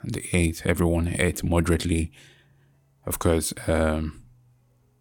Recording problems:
none

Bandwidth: 18.5 kHz